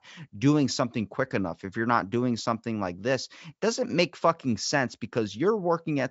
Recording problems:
high frequencies cut off; noticeable; nothing above 8 kHz

